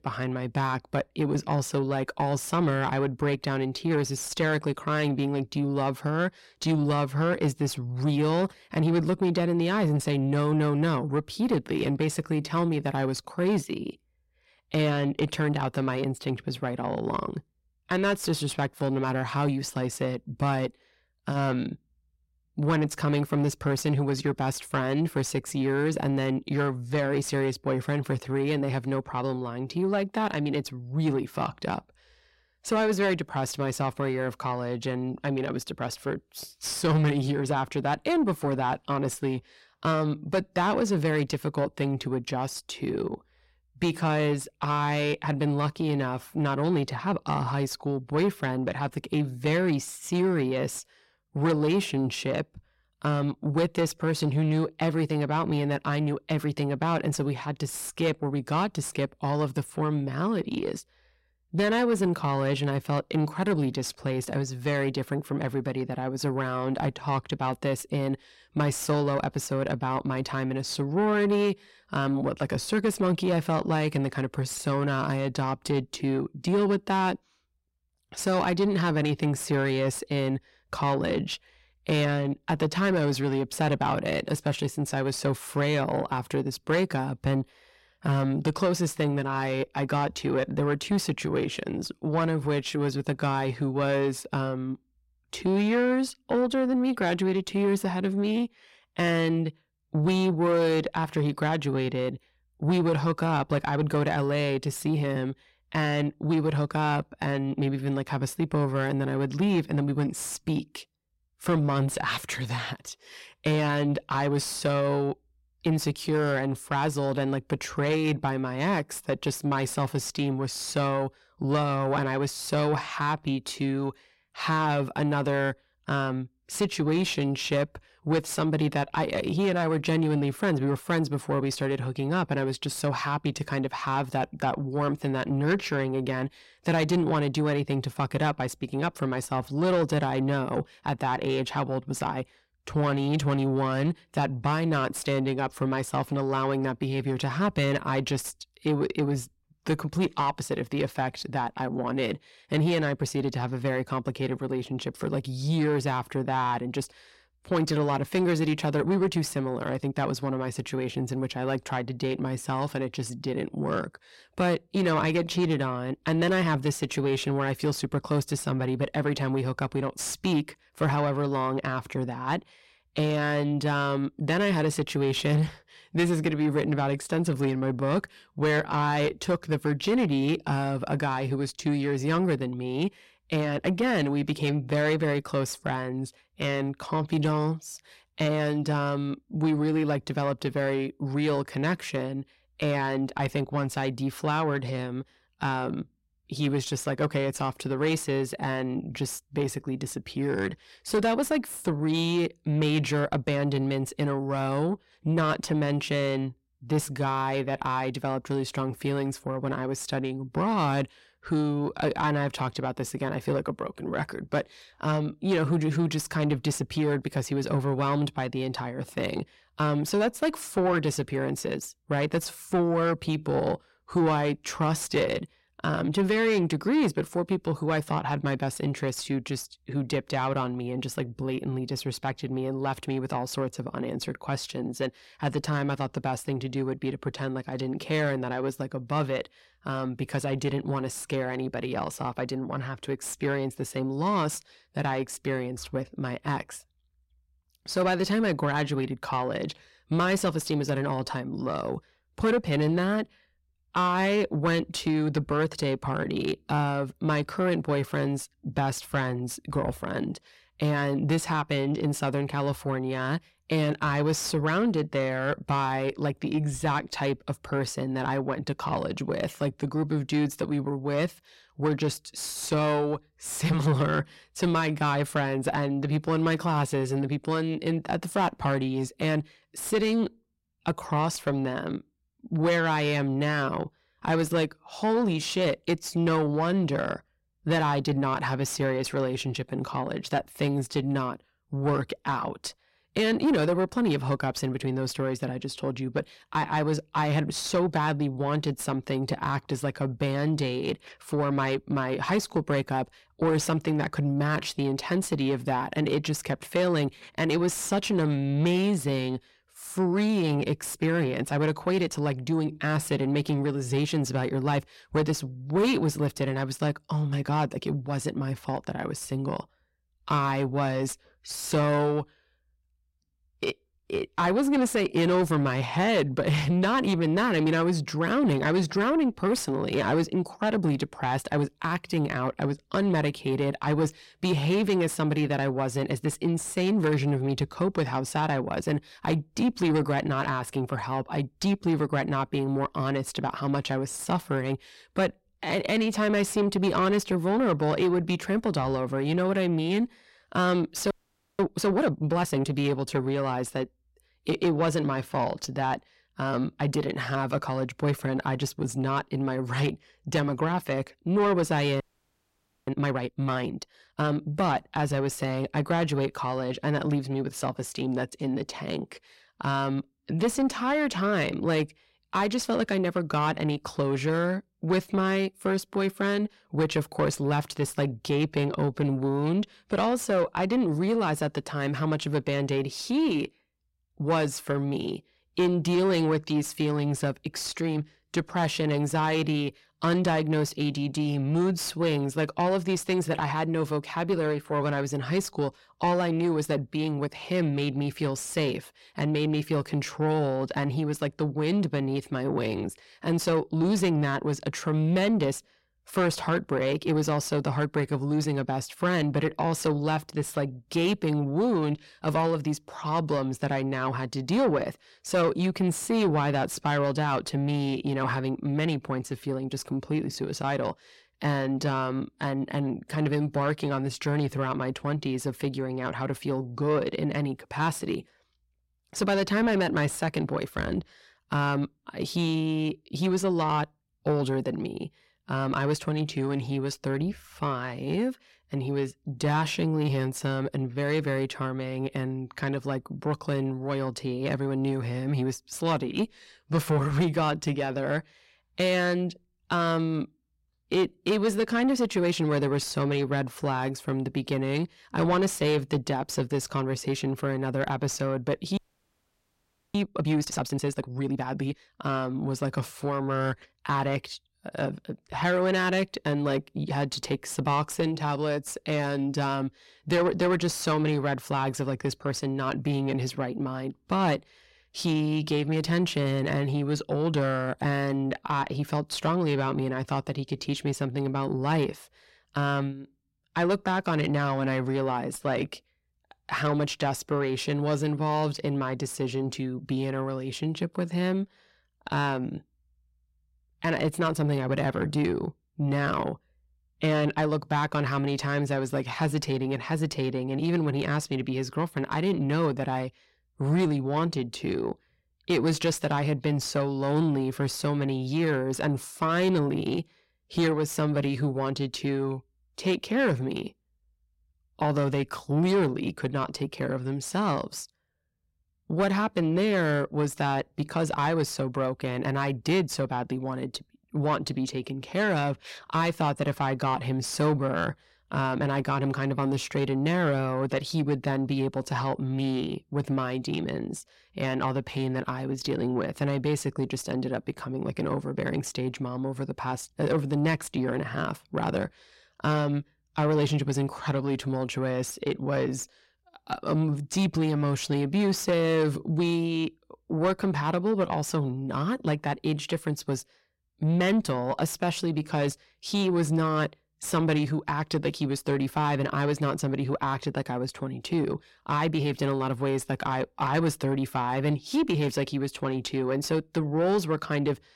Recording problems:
distortion; slight; 10 dB below the speech
audio freezing; at 5:51, at 6:02 for 1 s and at 7:39 for 1 s

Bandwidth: 16 kHz